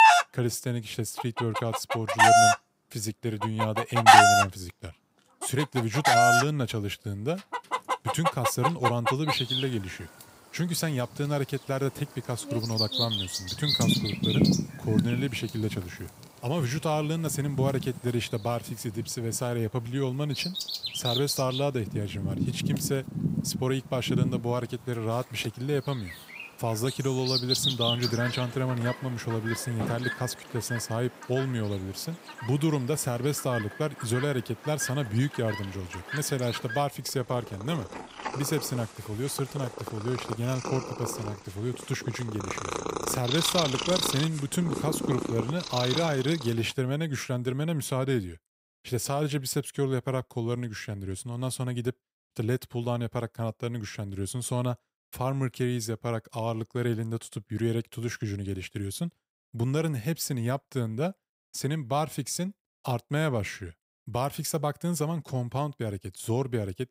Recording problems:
animal sounds; very loud; until 46 s; 3 dB above the speech

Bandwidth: 15.5 kHz